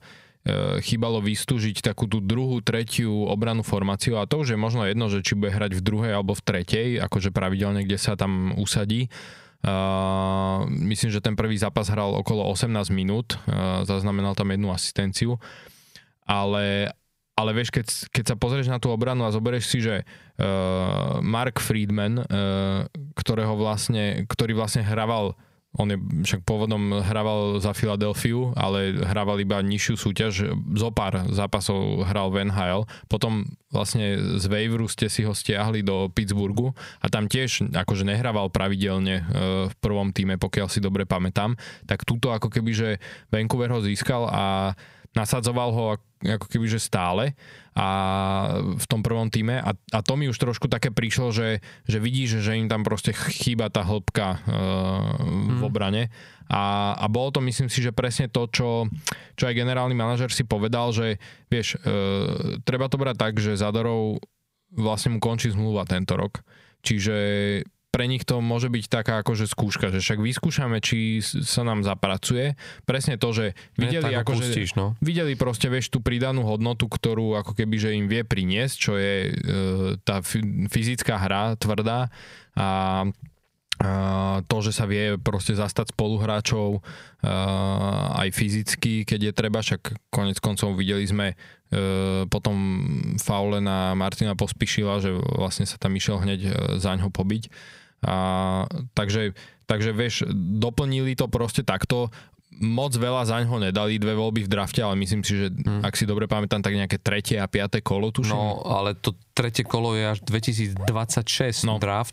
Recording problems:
squashed, flat; somewhat

